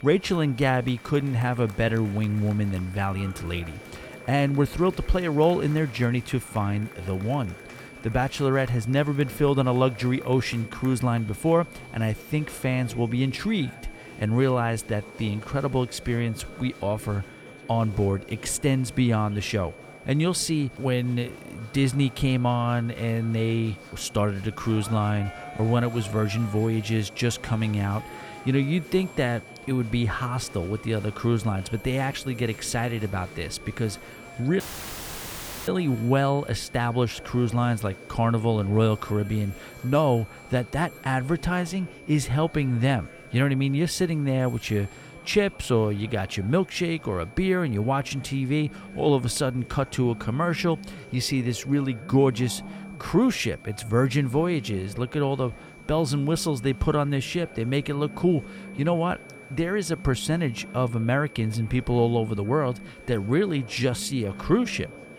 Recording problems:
murmuring crowd; noticeable; throughout; 20 dB below the speech
high-pitched whine; faint; throughout; 2.5 kHz, 20 dB below the speech
alarms or sirens; faint; throughout; 20 dB below the speech
audio cutting out; filled with static; at 35 s for 1 s

